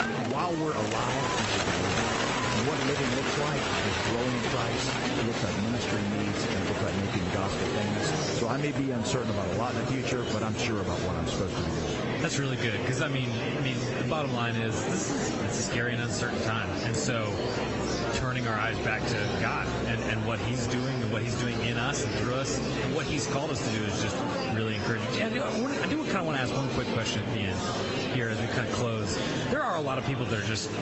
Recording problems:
high frequencies cut off; noticeable; nothing above 8 kHz
garbled, watery; slightly
squashed, flat; somewhat
animal sounds; loud; throughout; 1 dB below the speech
murmuring crowd; loud; throughout; 1 dB below the speech

